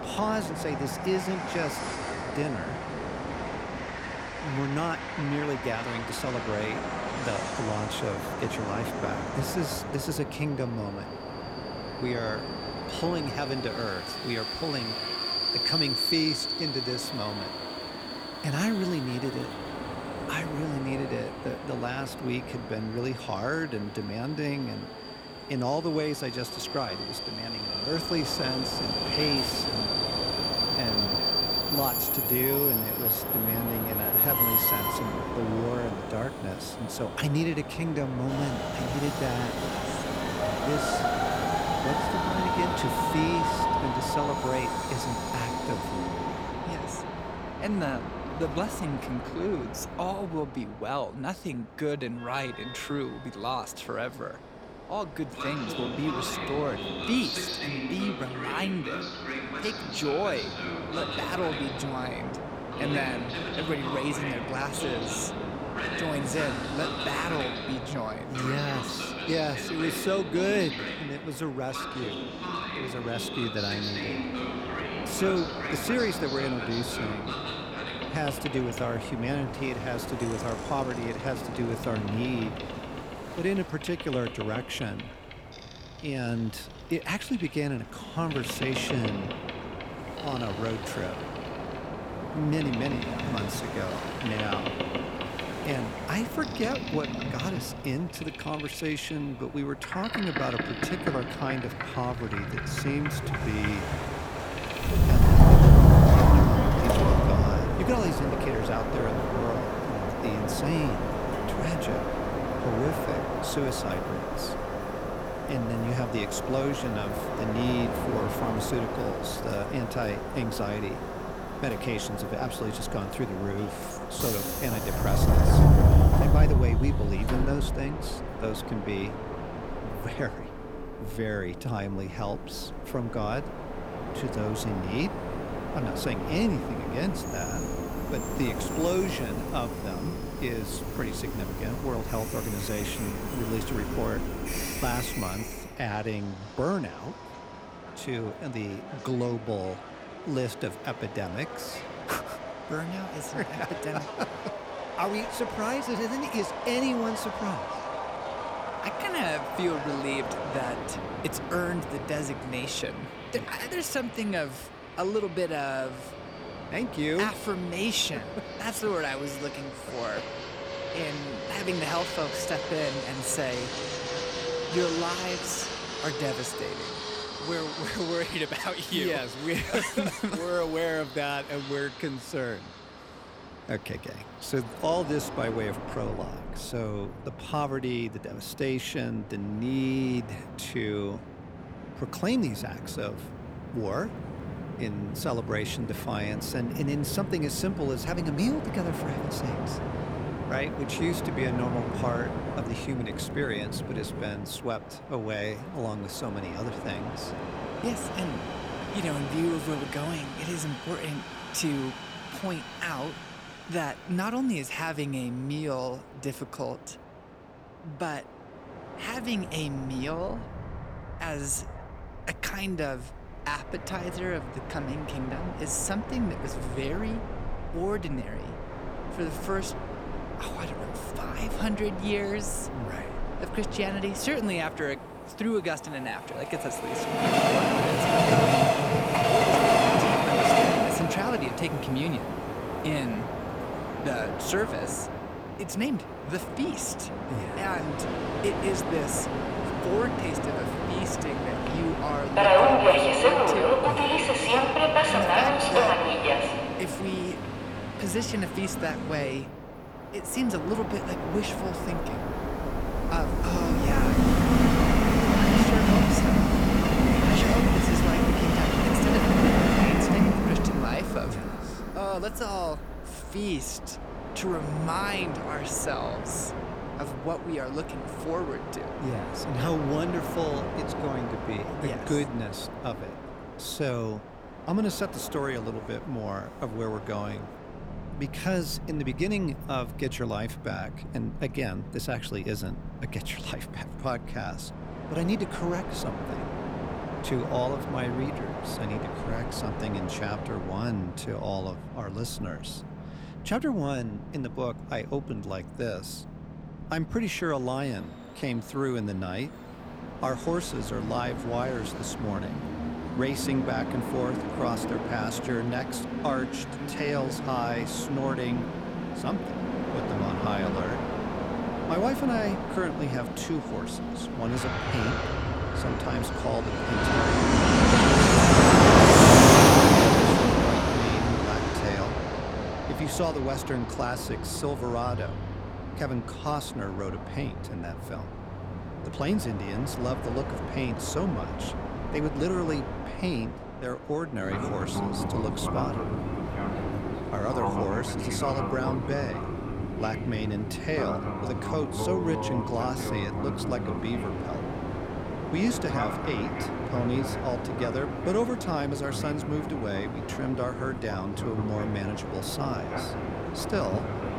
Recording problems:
train or aircraft noise; very loud; throughout; 4 dB above the speech

